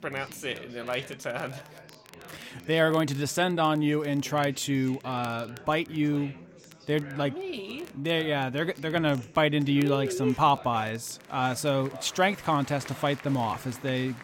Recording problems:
chatter from many people; noticeable; throughout; 20 dB below the speech
crackle, like an old record; faint; 25 dB below the speech

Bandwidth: 16.5 kHz